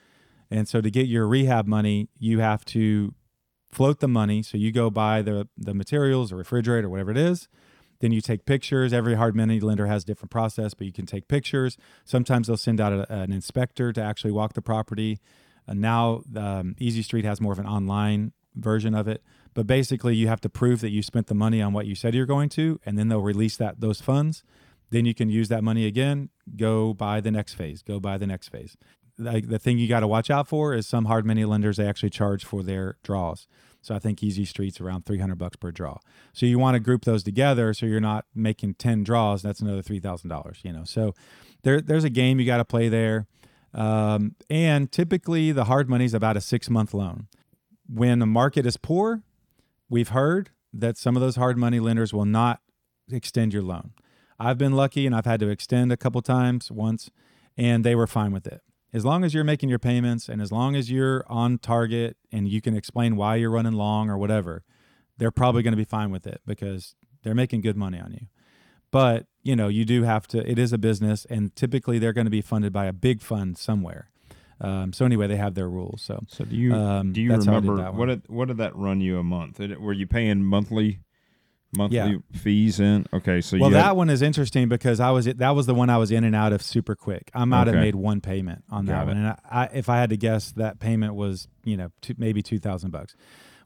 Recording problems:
none

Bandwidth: 18 kHz